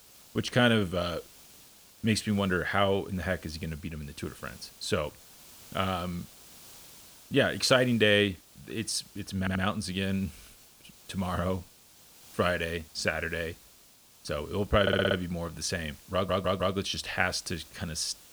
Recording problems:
hiss; faint; throughout; 20 dB below the speech
audio stuttering; at 9.5 s, at 15 s and at 16 s

